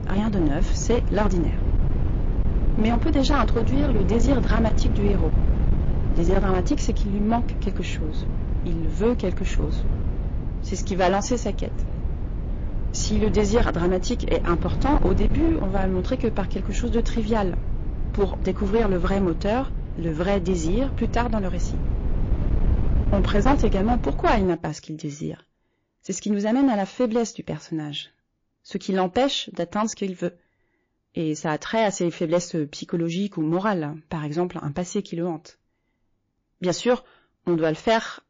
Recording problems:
distortion; slight; 7% of the sound clipped
garbled, watery; slightly
low rumble; noticeable; until 24 s; 10 dB below the speech

